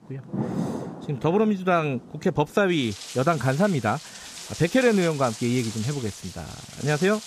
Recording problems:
rain or running water; noticeable; throughout; 10 dB below the speech

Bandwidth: 15 kHz